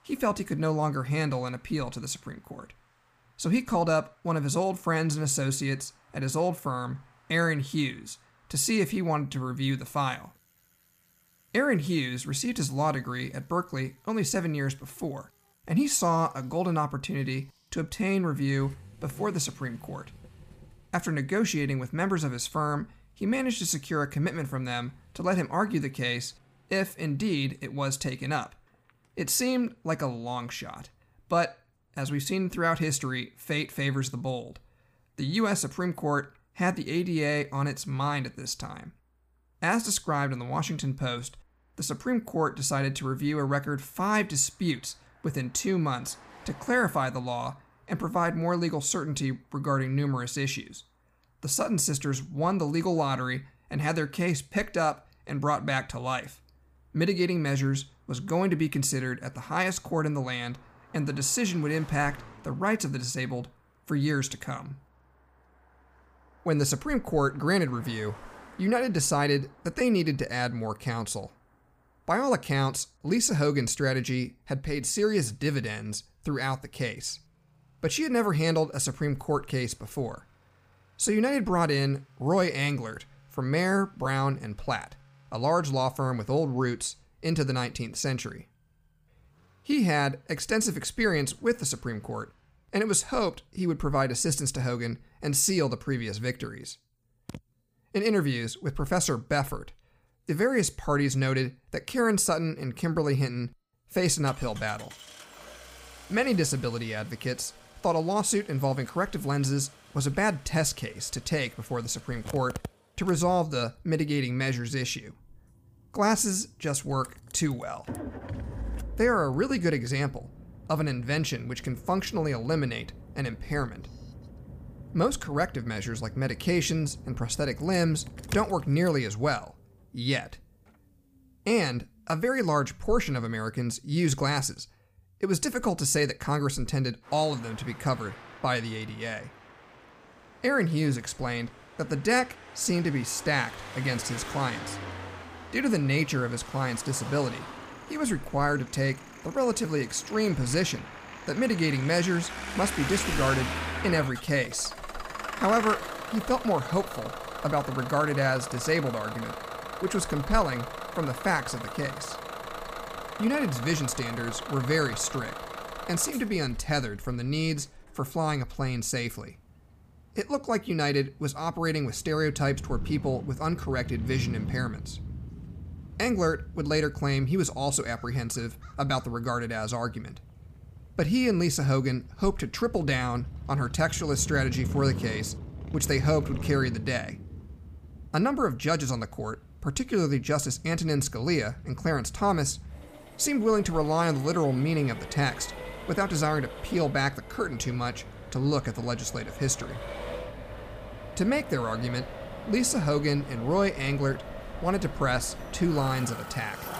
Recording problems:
traffic noise; noticeable; throughout; 10 dB below the speech

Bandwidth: 15 kHz